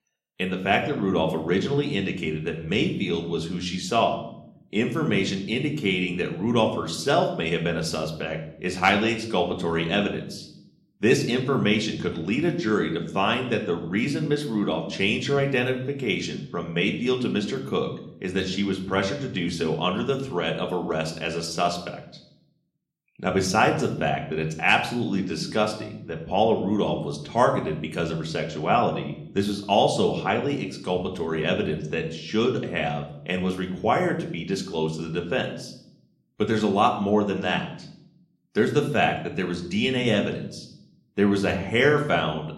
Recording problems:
room echo; slight; dies away in 0.6 s
off-mic speech; somewhat distant

